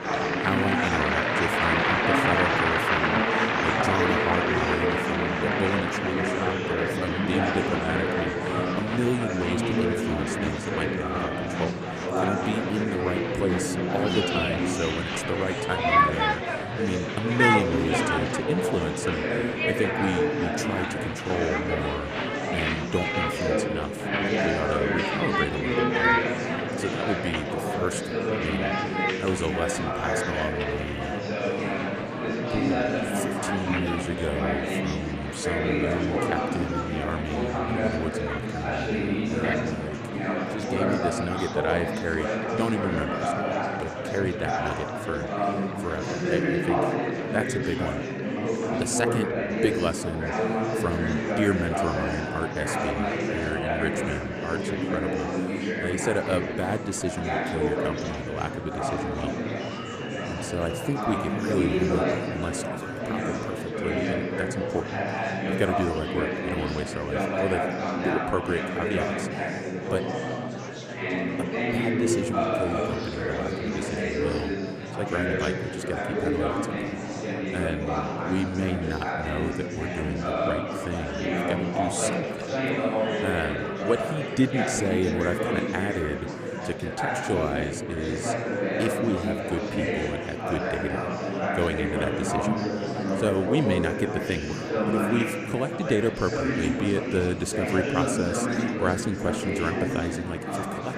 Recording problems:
murmuring crowd; very loud; throughout; 4 dB above the speech

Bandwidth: 14.5 kHz